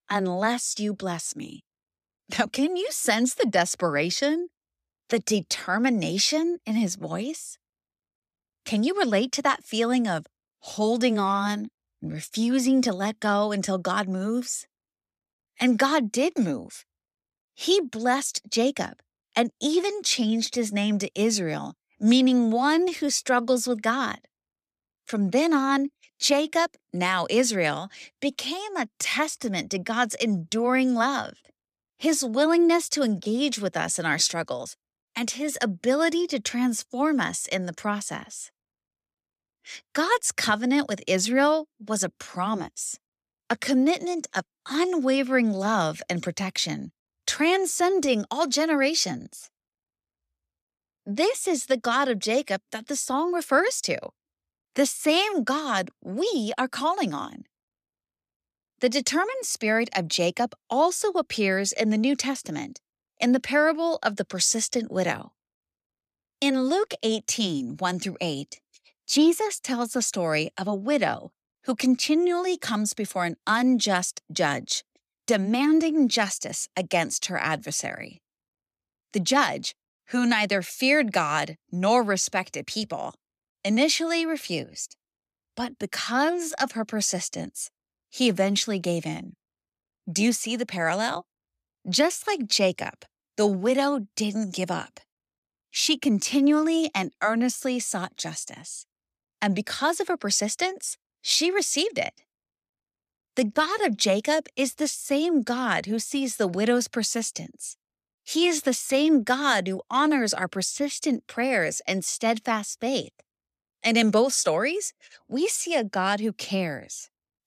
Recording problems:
none

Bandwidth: 14.5 kHz